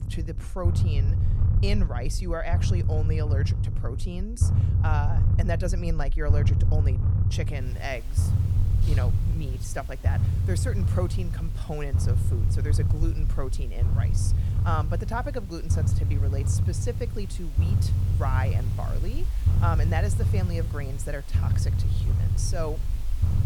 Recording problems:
low rumble; loud; throughout; 5 dB below the speech
hiss; noticeable; from 7.5 s on; 15 dB below the speech

